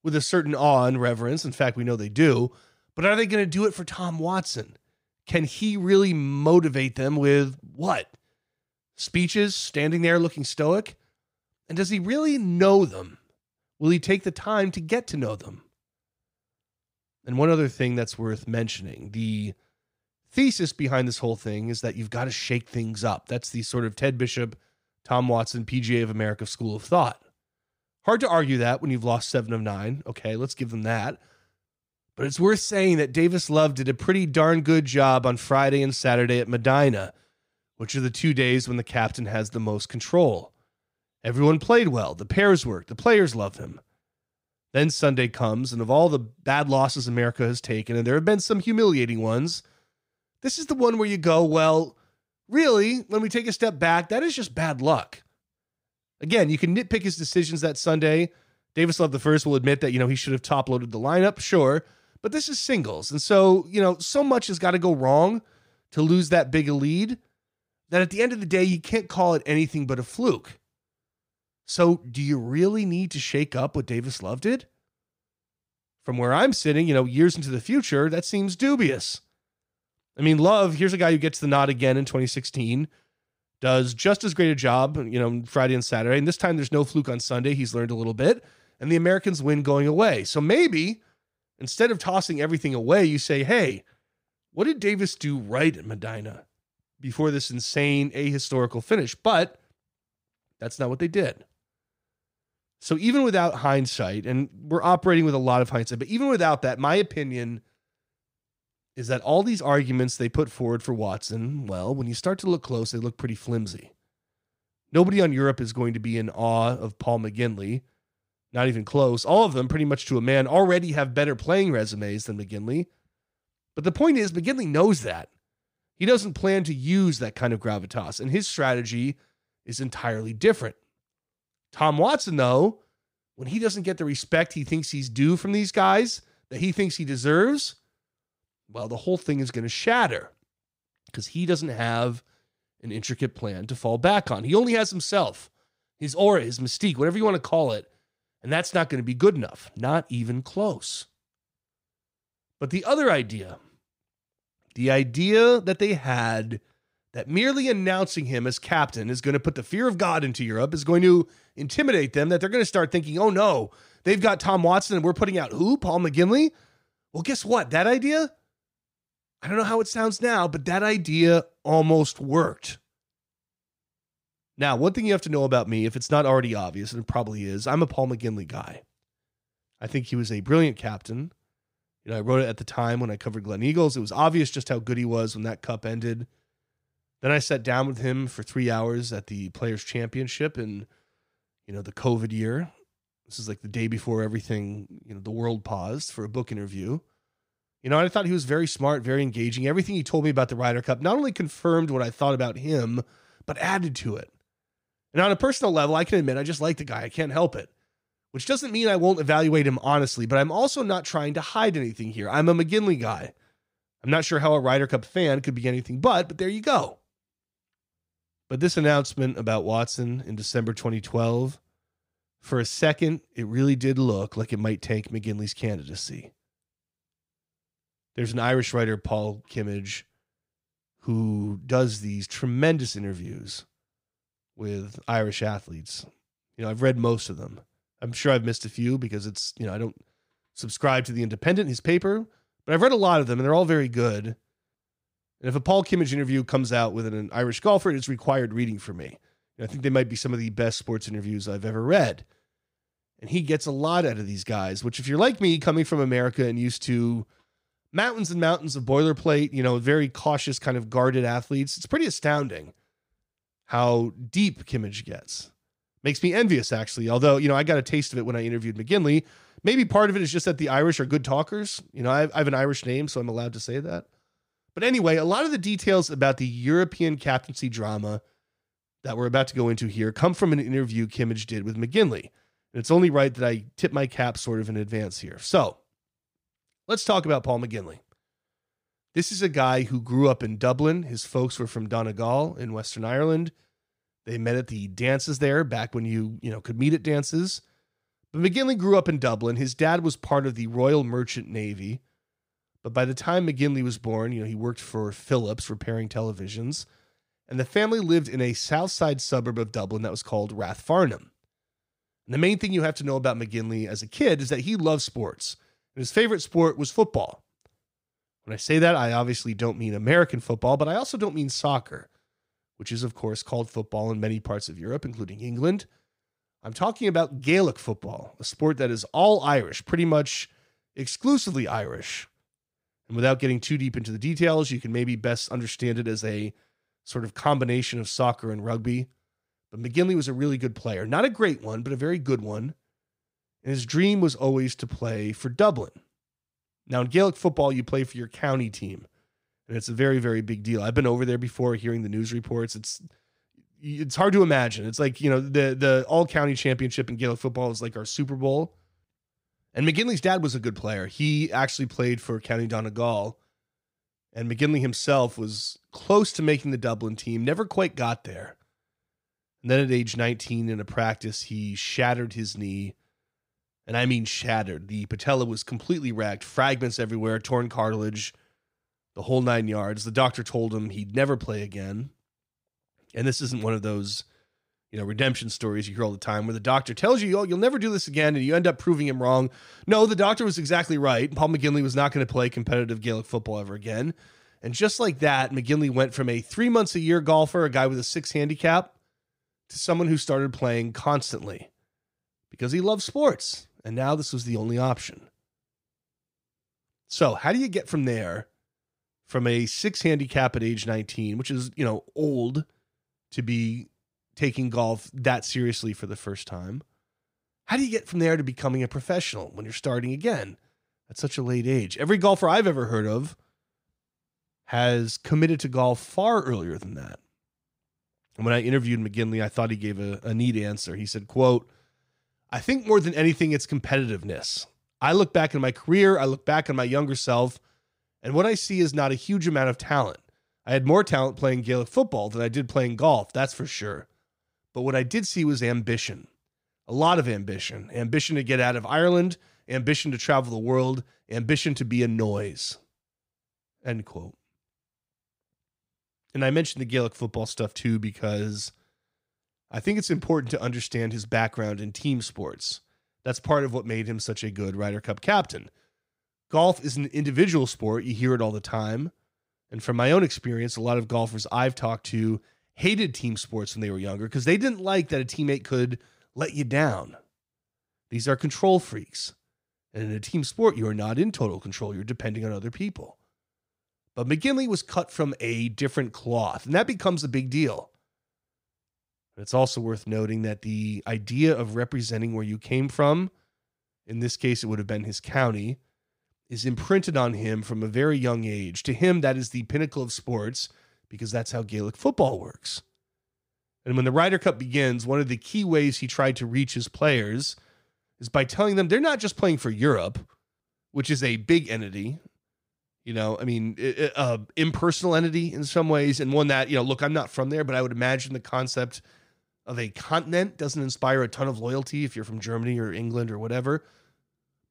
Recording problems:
none

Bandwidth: 15.5 kHz